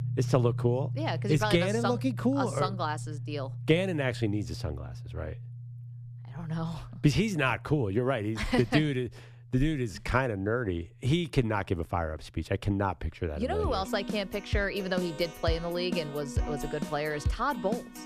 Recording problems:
background music; loud; throughout; 8 dB below the speech

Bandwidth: 14.5 kHz